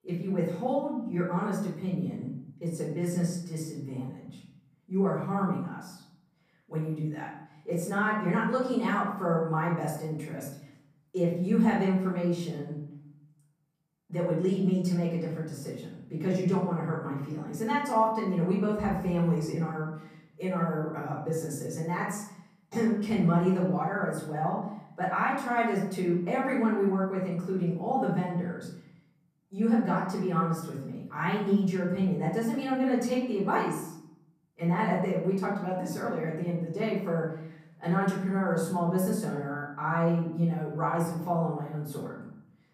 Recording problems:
off-mic speech; far
room echo; noticeable; dies away in 0.7 s

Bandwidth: 15 kHz